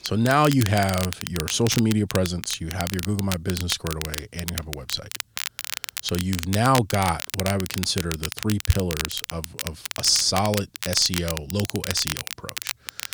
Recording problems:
crackle, like an old record; loud; 7 dB below the speech

